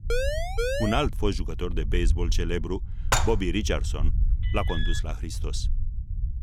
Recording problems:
low rumble; noticeable; throughout; 20 dB below the speech
siren; loud; at the start; peak 2 dB above the speech
clattering dishes; loud; at 3 s; peak 4 dB above the speech
alarm; noticeable; at 4.5 s; peak 5 dB below the speech

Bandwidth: 16 kHz